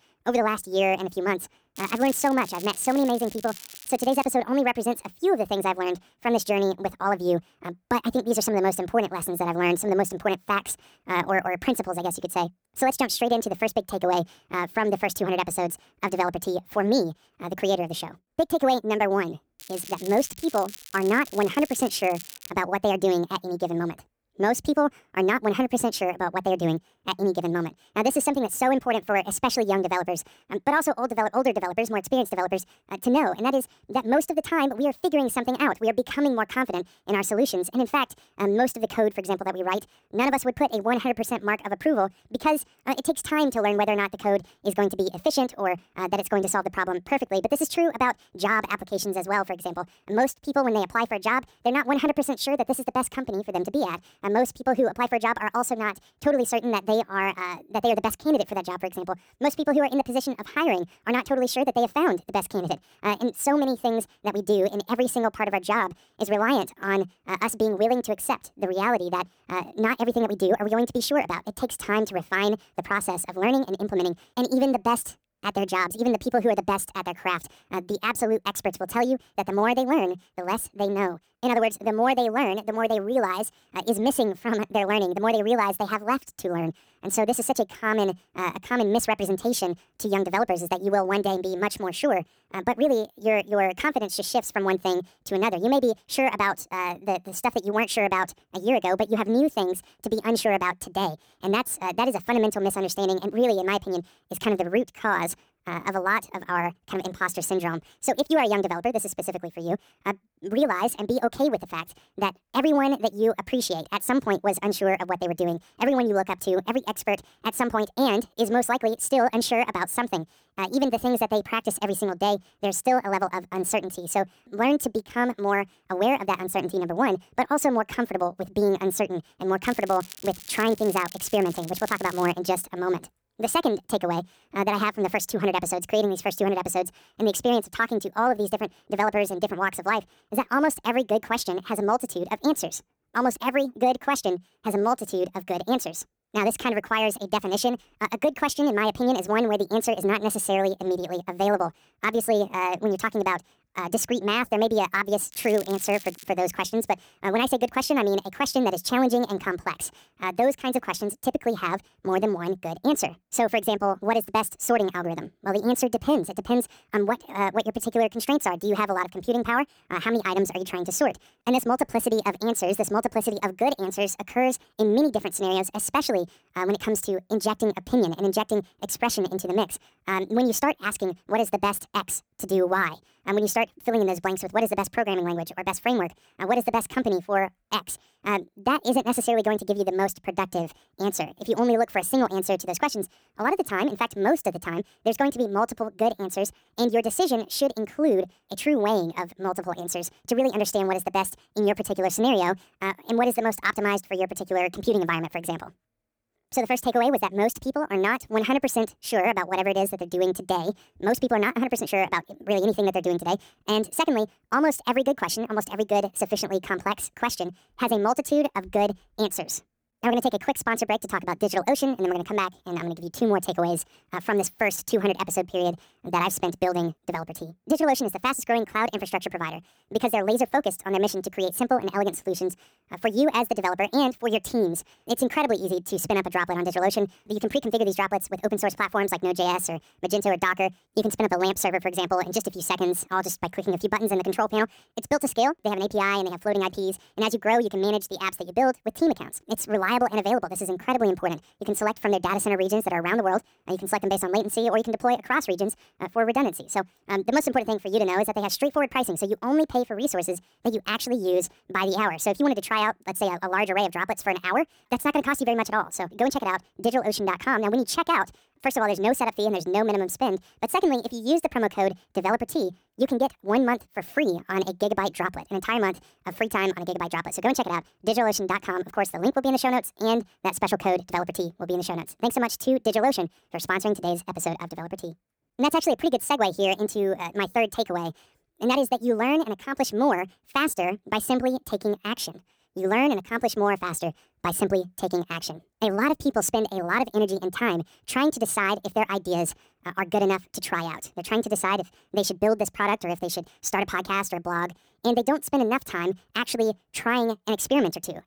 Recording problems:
wrong speed and pitch; too fast and too high; 1.6 times normal speed
crackling; noticeable; 4 times, first at 2 s; 15 dB below the speech

